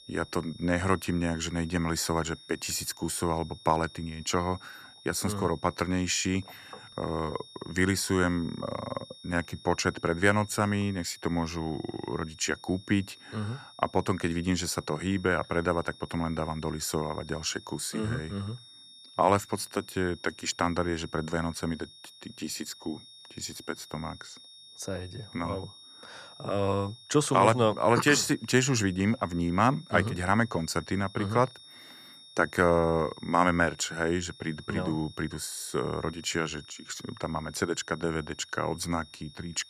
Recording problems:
high-pitched whine; noticeable; throughout; 3.5 kHz, 20 dB below the speech

